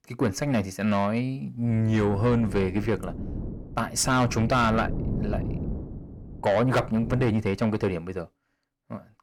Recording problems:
distortion; slight; 10 dB below the speech
wind noise on the microphone; occasional gusts; from 1.5 to 7.5 s; 15 dB below the speech

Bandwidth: 18.5 kHz